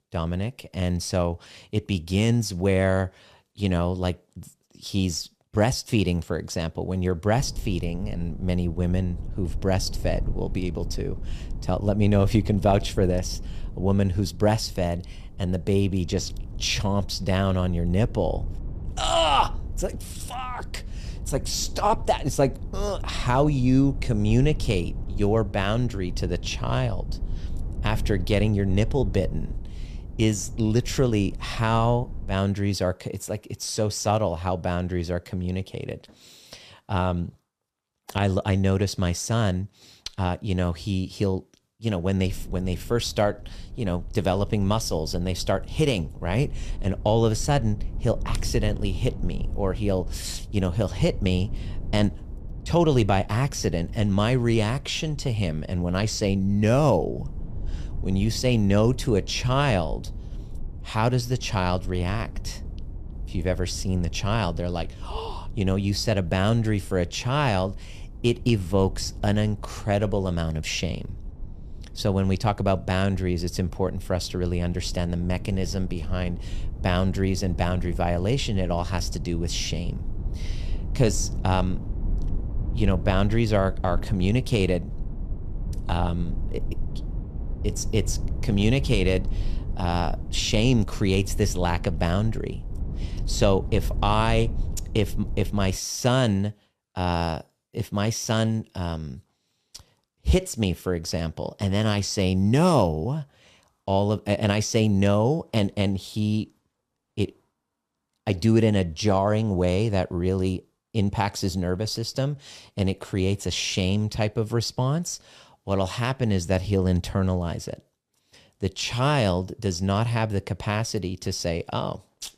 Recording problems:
low rumble; faint; from 7.5 to 32 s and from 42 s to 1:36; 20 dB below the speech

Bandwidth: 14.5 kHz